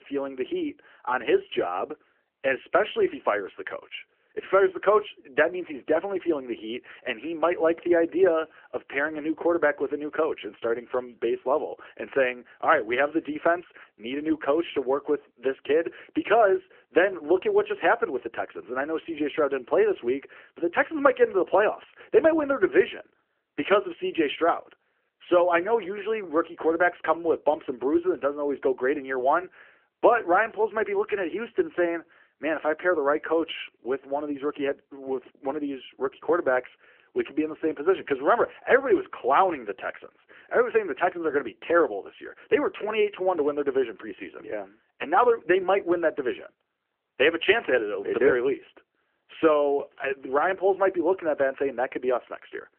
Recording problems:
phone-call audio; nothing above 3 kHz

